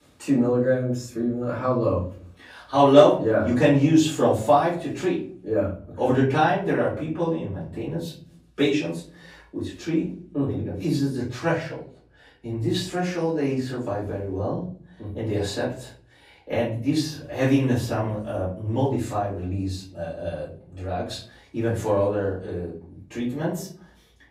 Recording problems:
off-mic speech; far
room echo; slight; dies away in 0.5 s

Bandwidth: 15.5 kHz